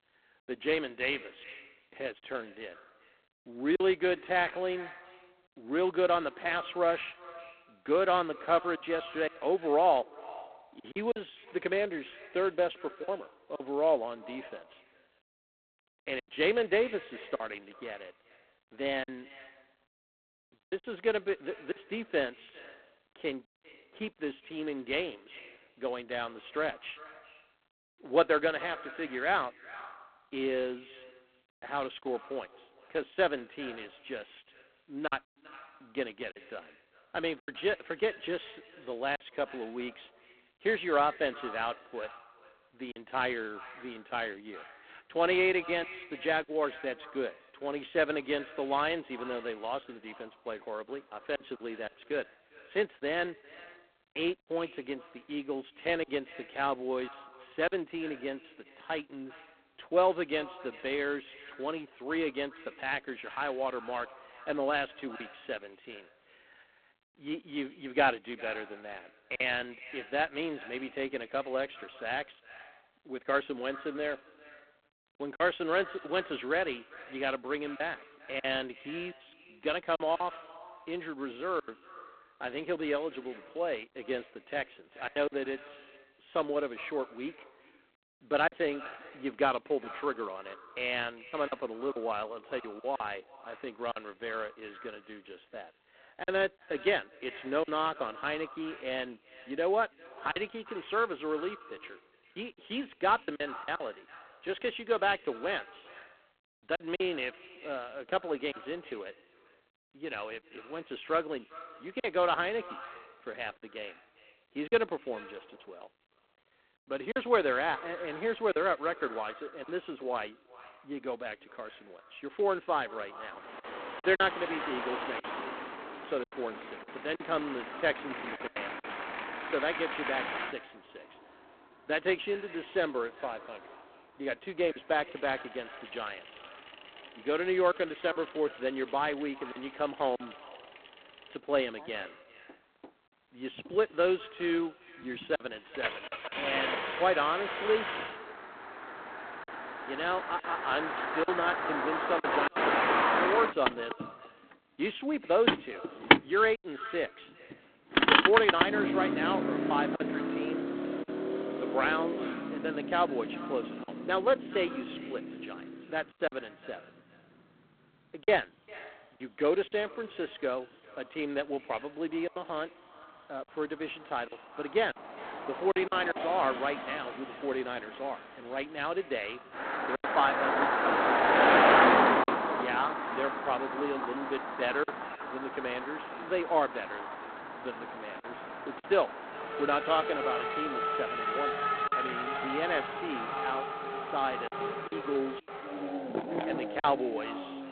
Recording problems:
phone-call audio; poor line; nothing above 3.5 kHz
echo of what is said; noticeable; throughout; 400 ms later, 20 dB below the speech
traffic noise; very loud; from 2:04 on; 2 dB above the speech
choppy; occasionally; 4% of the speech affected

